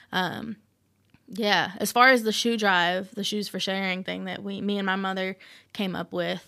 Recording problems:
none

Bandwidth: 15 kHz